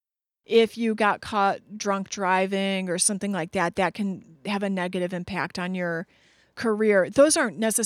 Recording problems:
abrupt cut into speech; at the end

